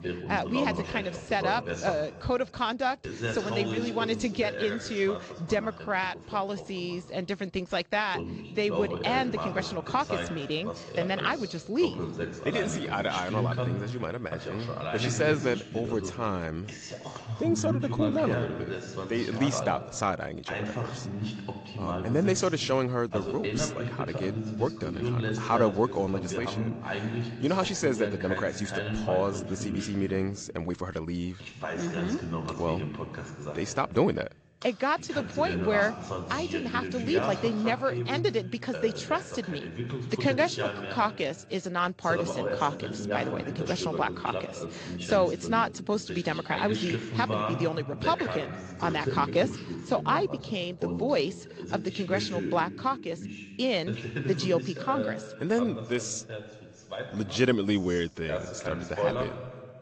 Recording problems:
garbled, watery; slightly; nothing above 7.5 kHz
voice in the background; loud; throughout; 5 dB below the speech

